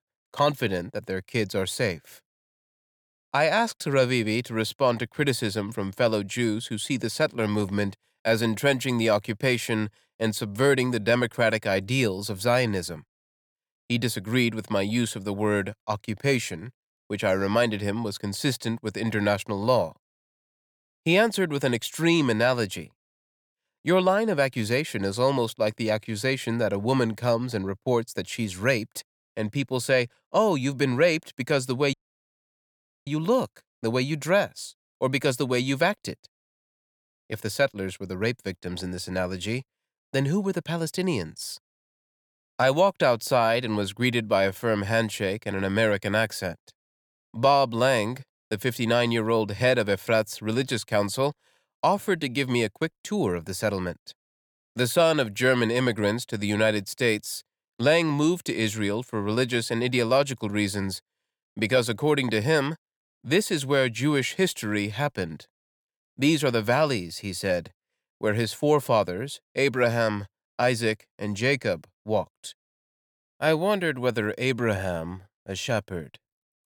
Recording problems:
audio cutting out; at 32 s for 1 s

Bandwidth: 18 kHz